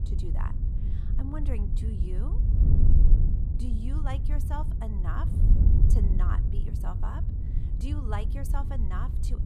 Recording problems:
wind noise on the microphone; heavy; 2 dB below the speech

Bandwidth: 15 kHz